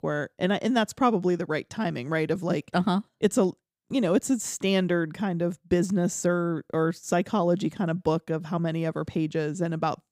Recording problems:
none

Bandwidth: 15.5 kHz